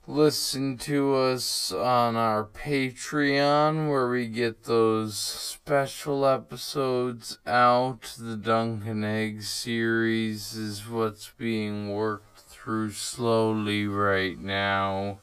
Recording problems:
wrong speed, natural pitch; too slow; 0.5 times normal speed

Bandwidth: 15 kHz